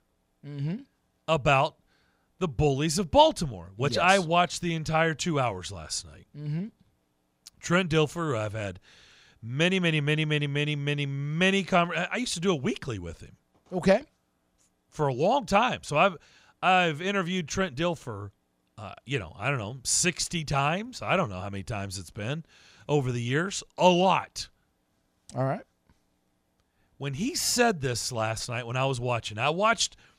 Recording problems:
none

